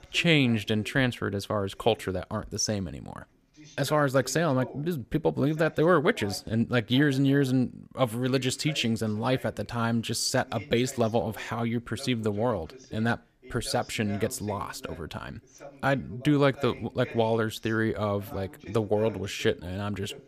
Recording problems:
voice in the background; faint; throughout; 20 dB below the speech

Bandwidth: 15 kHz